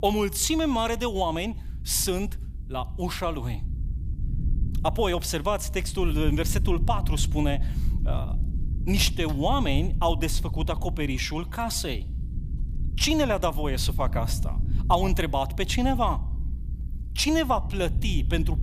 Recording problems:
low rumble; noticeable; throughout; 20 dB below the speech

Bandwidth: 14.5 kHz